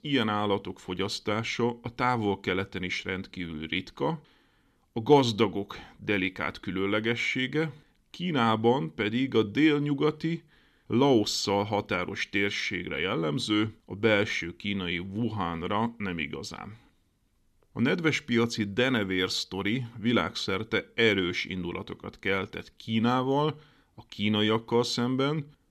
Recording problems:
none

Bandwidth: 13.5 kHz